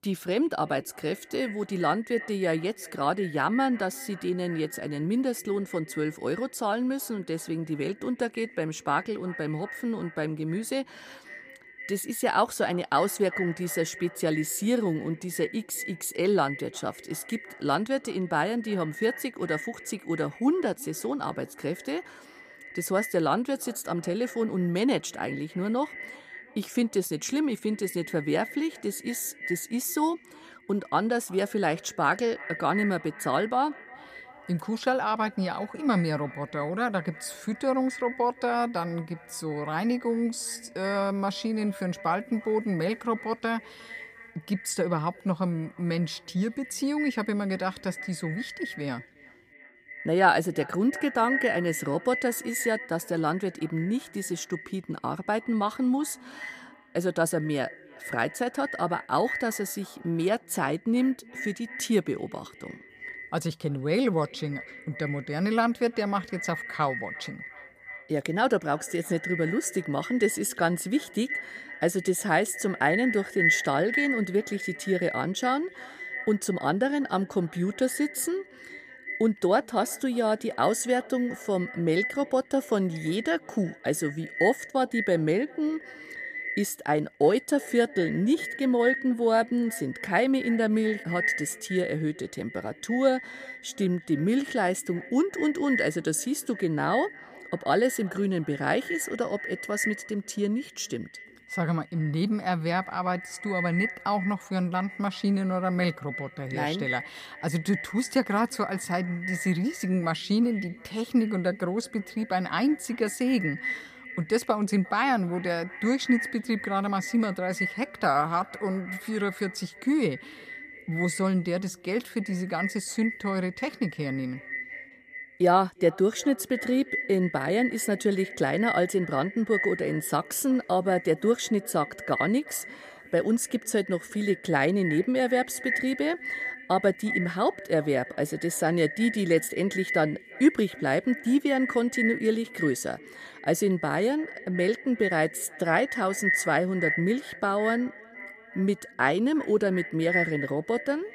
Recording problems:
echo of what is said; strong; throughout; 350 ms later, 9 dB below the speech

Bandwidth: 15 kHz